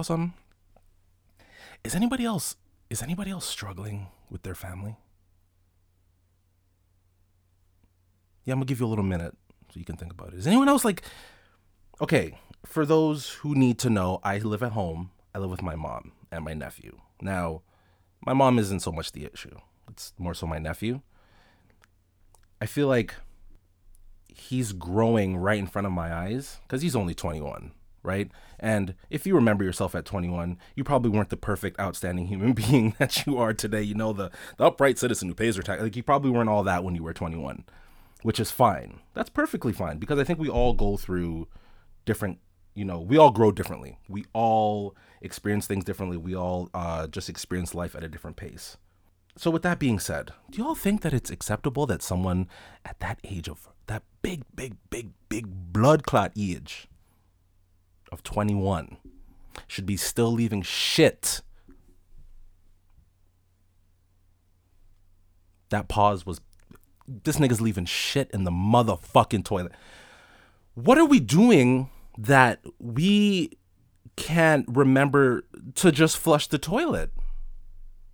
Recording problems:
abrupt cut into speech; at the start

